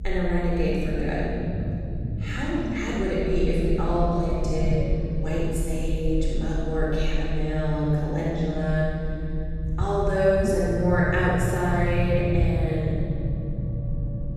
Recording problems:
room echo; strong; dies away in 2.8 s
off-mic speech; far
low rumble; noticeable; throughout; 15 dB below the speech

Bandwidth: 13.5 kHz